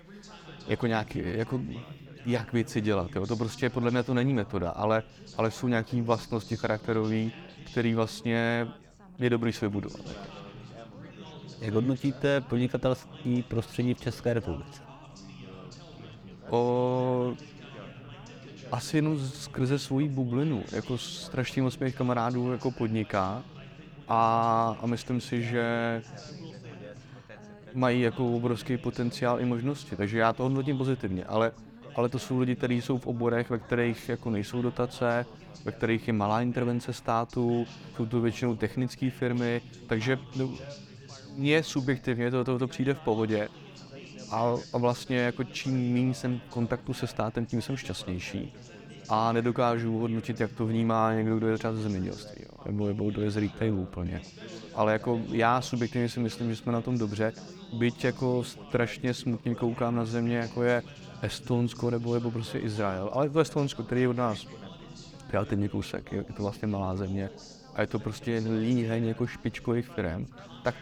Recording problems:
background chatter; noticeable; throughout; 4 voices, 15 dB below the speech

